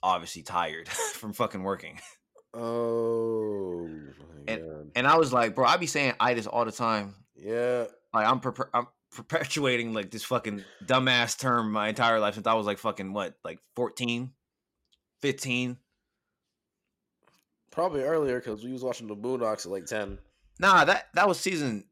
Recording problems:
none

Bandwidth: 16 kHz